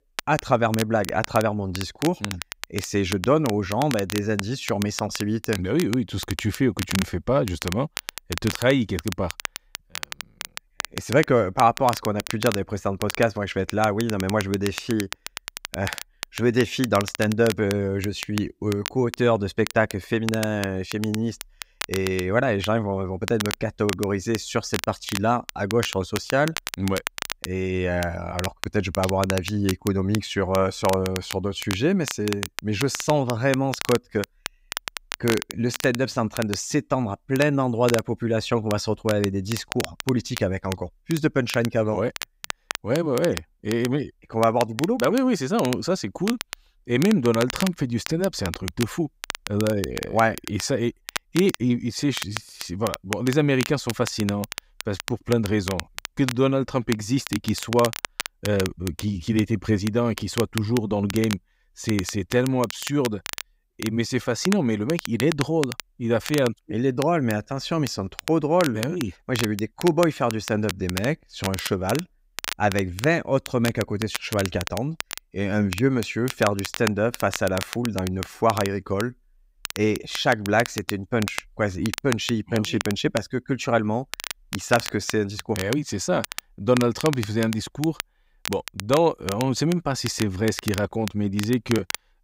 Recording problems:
crackle, like an old record; loud; 10 dB below the speech

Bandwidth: 15.5 kHz